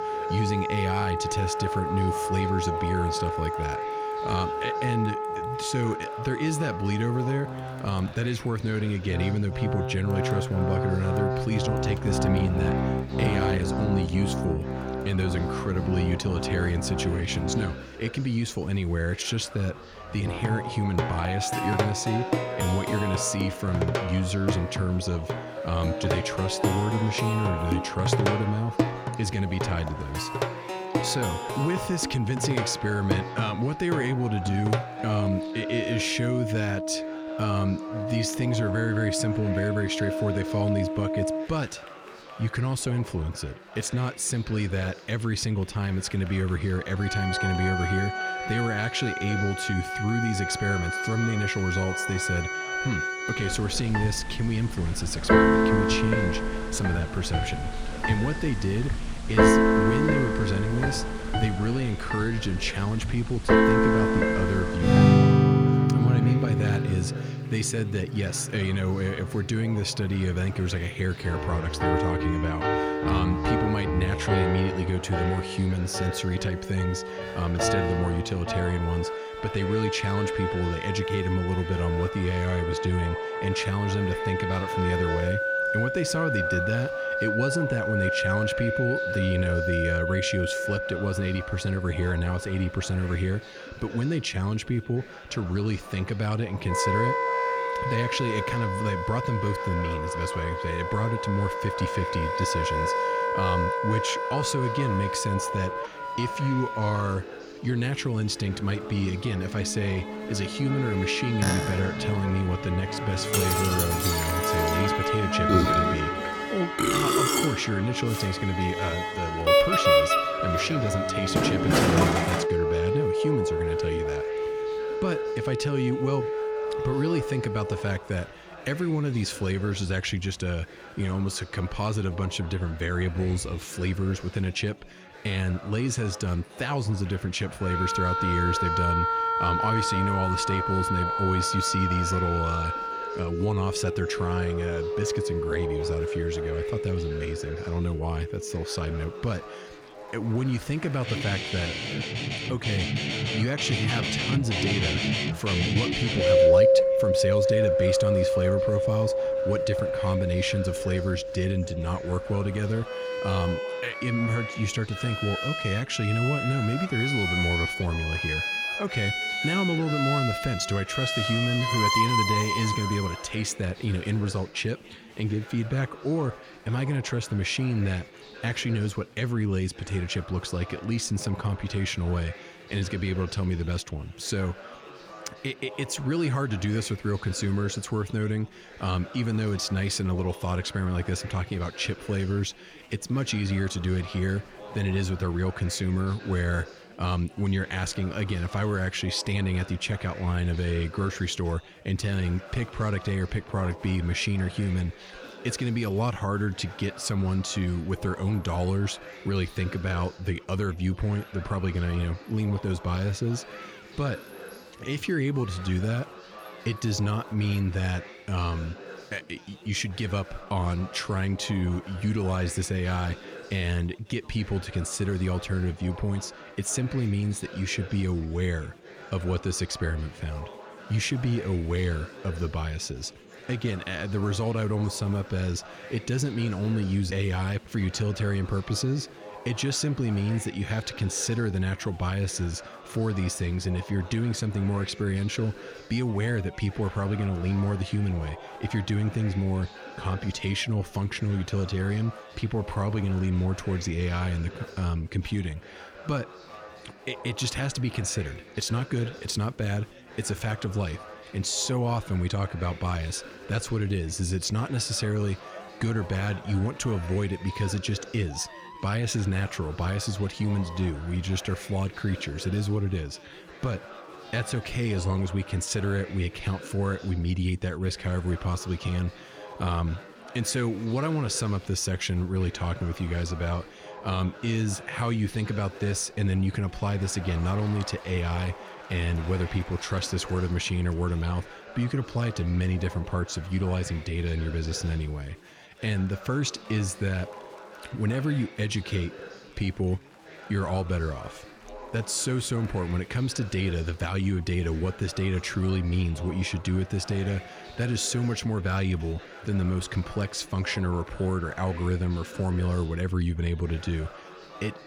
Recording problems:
background music; very loud; until 2:53; 1 dB above the speech
chatter from many people; noticeable; throughout; 15 dB below the speech

